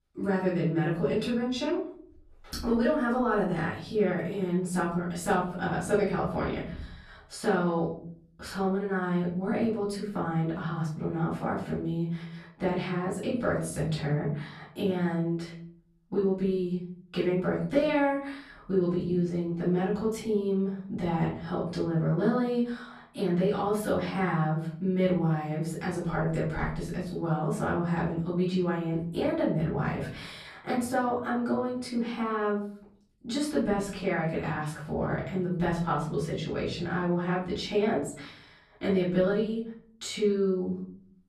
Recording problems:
off-mic speech; far
room echo; noticeable; dies away in 0.8 s

